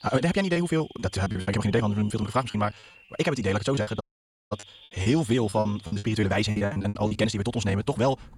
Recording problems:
wrong speed, natural pitch; too fast; 1.8 times normal speed
animal sounds; faint; throughout; 25 dB below the speech
choppy; very; from 0.5 to 2.5 s and from 4 to 7 s; 20% of the speech affected
audio cutting out; at 4 s for 0.5 s

